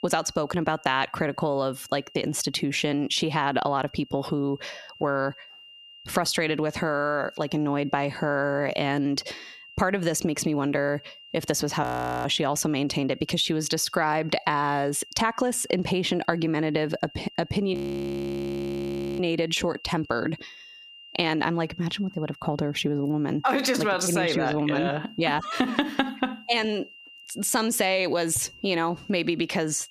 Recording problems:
squashed, flat; heavily
high-pitched whine; faint; throughout; 3 kHz, 25 dB below the speech
audio freezing; at 12 s and at 18 s for 1.5 s

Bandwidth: 14.5 kHz